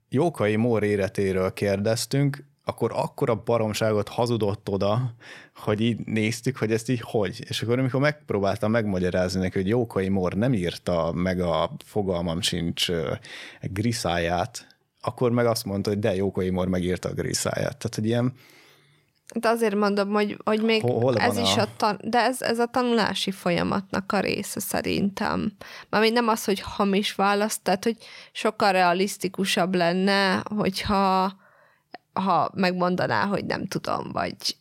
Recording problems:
none

